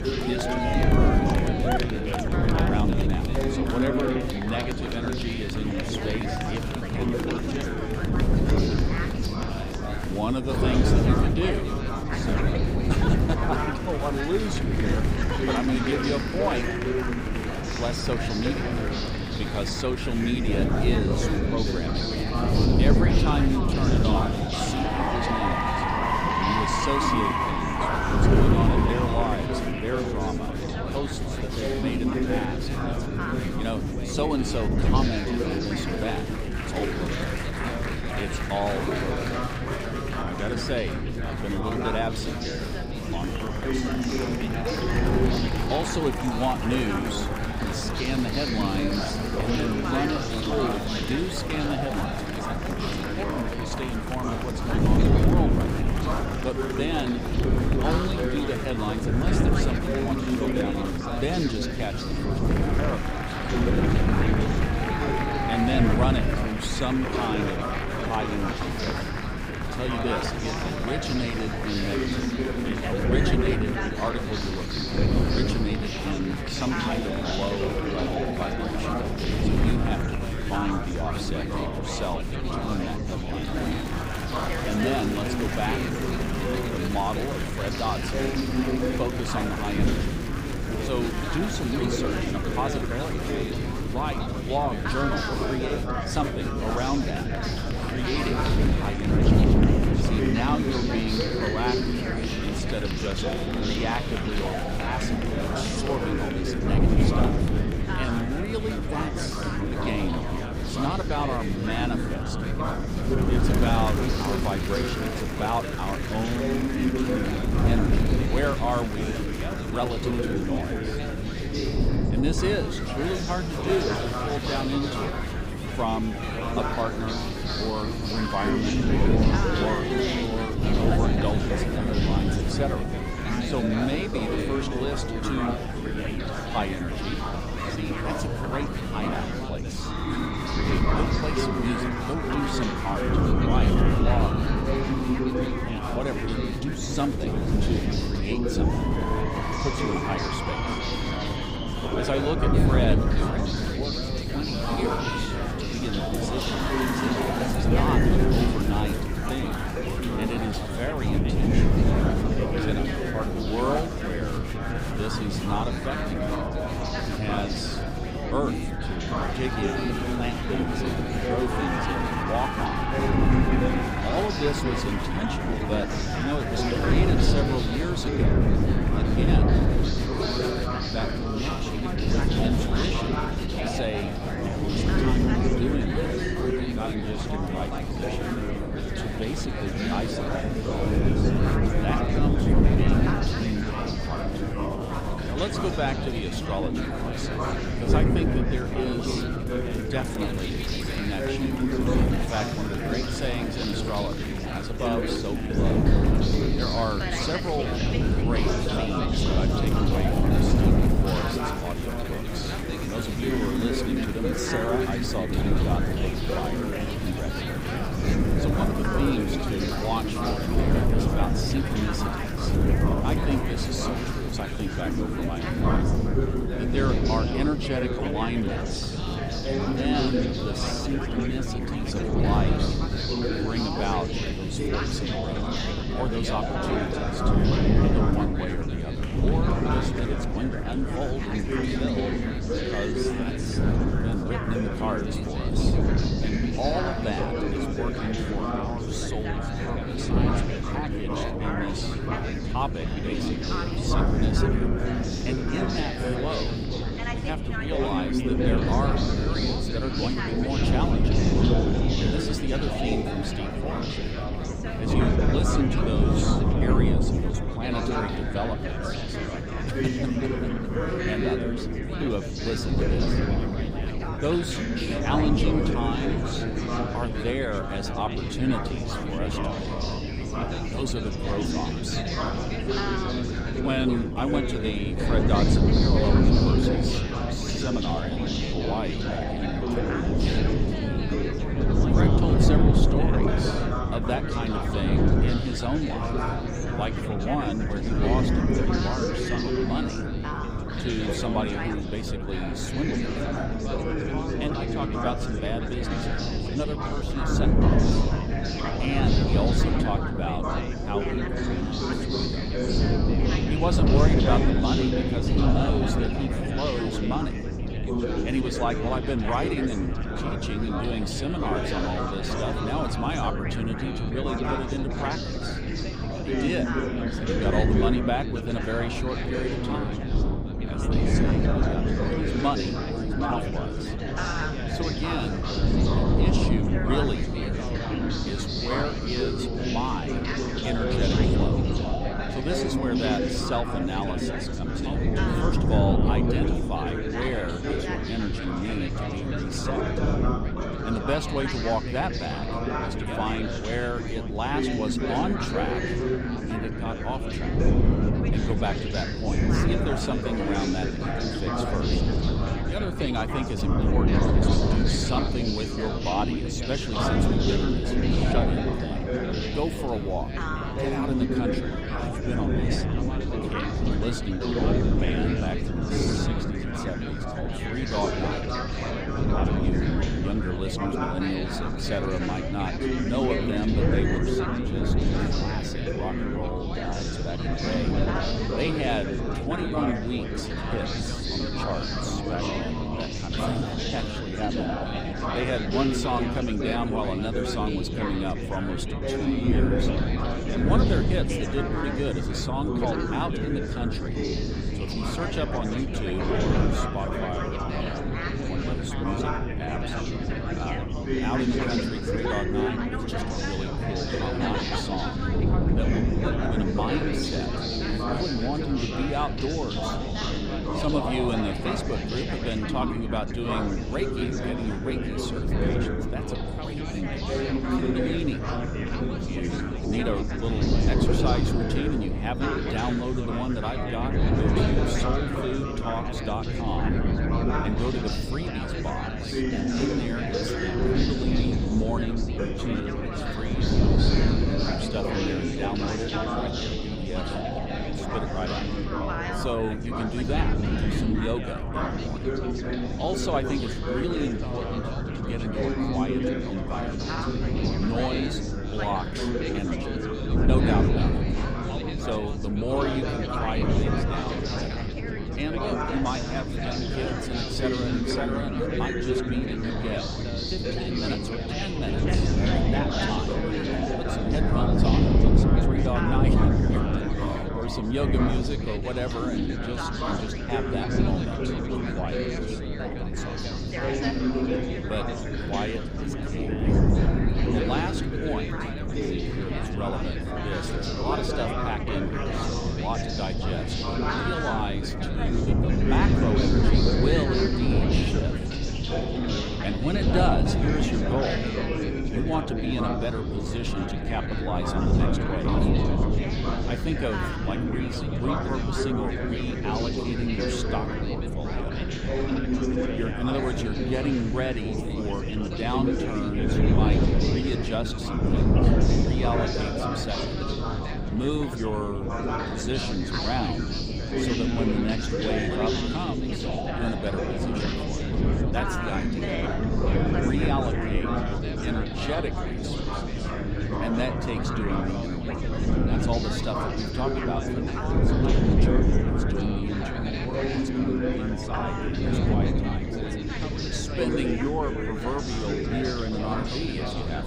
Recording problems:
chatter from many people; very loud; throughout; 1 dB above the speech
wind noise on the microphone; heavy; 3 dB below the speech

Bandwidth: 15.5 kHz